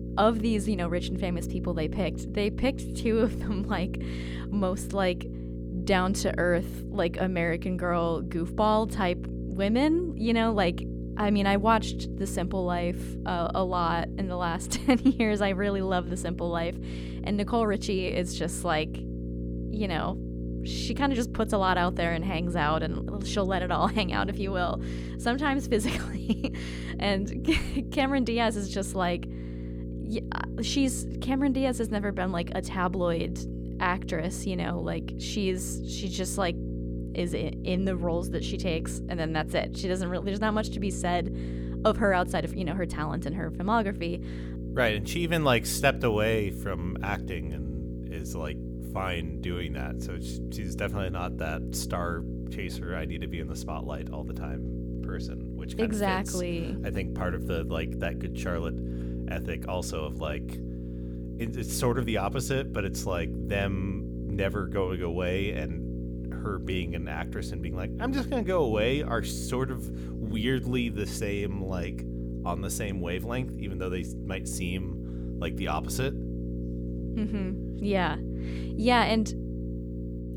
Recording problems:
electrical hum; noticeable; throughout; 60 Hz, 15 dB below the speech

